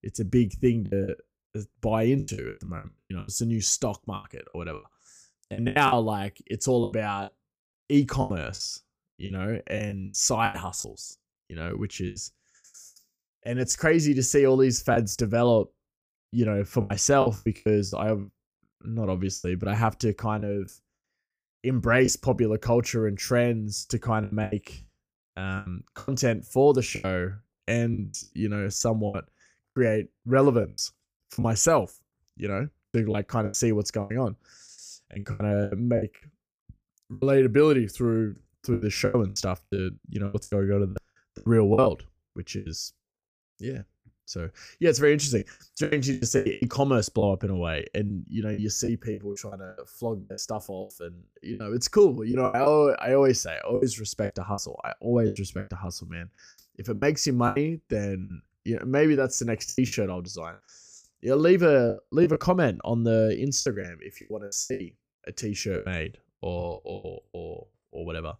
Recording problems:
choppy; very; 13% of the speech affected

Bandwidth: 15 kHz